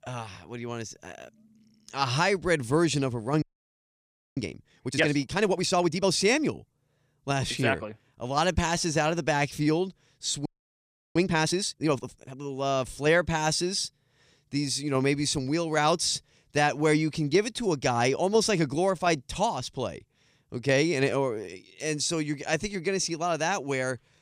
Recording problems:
audio freezing; at 3.5 s for 1 s and at 10 s for 0.5 s

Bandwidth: 15 kHz